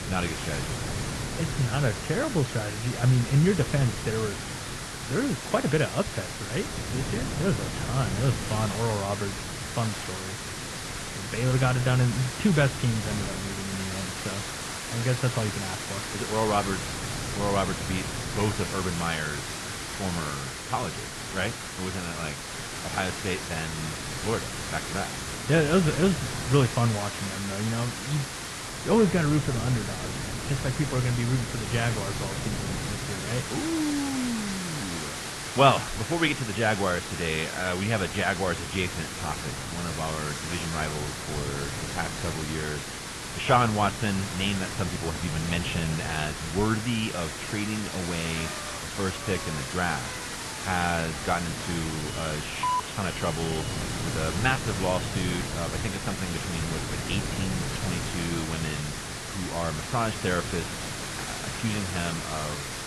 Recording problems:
muffled; very; fading above 3 kHz
garbled, watery; slightly
hiss; loud; throughout; 5 dB below the speech
wind noise on the microphone; occasional gusts; 15 dB below the speech
traffic noise; faint; throughout; 25 dB below the speech

